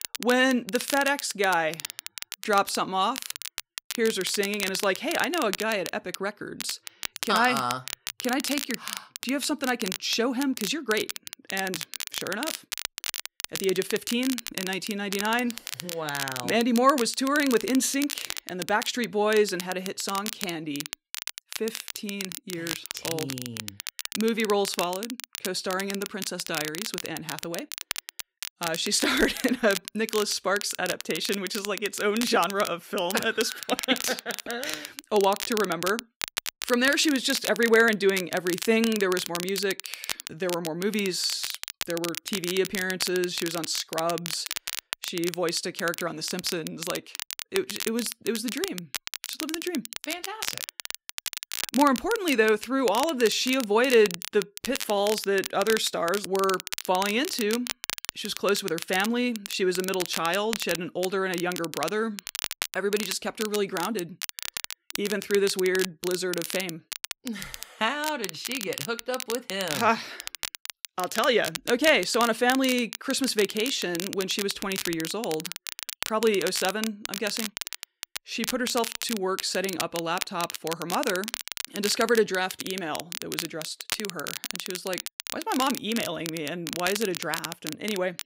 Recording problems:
crackle, like an old record; loud; 7 dB below the speech

